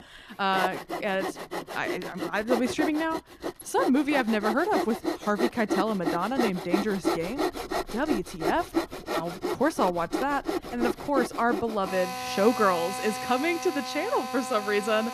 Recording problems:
machinery noise; loud; throughout; 4 dB below the speech

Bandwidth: 14.5 kHz